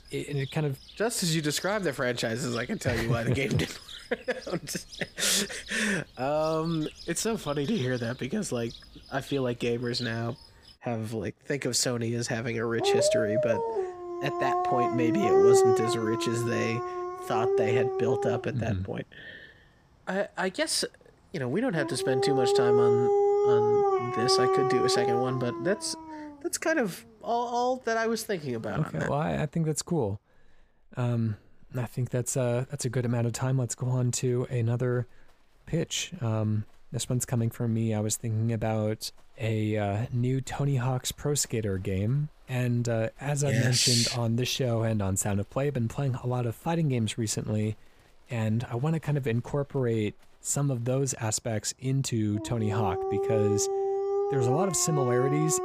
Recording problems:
animal sounds; very loud; throughout; 2 dB above the speech

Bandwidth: 15 kHz